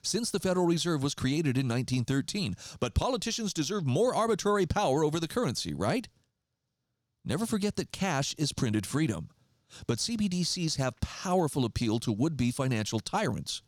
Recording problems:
none

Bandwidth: 18.5 kHz